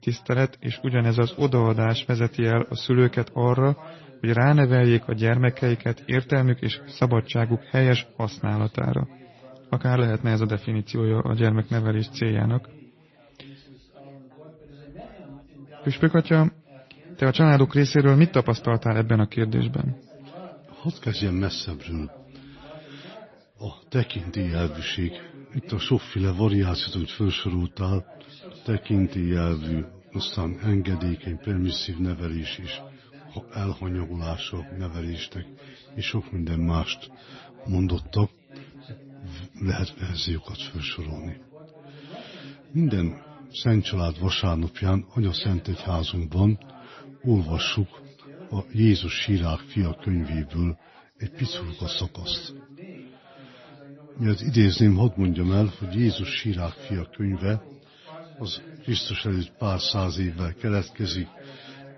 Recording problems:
garbled, watery; slightly; nothing above 6 kHz
background chatter; faint; throughout; 3 voices, 20 dB below the speech

